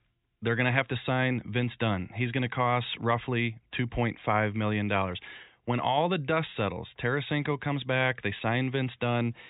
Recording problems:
high frequencies cut off; severe; nothing above 4 kHz

